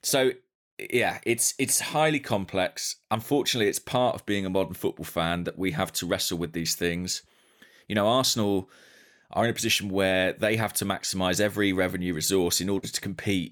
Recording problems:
none

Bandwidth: 18.5 kHz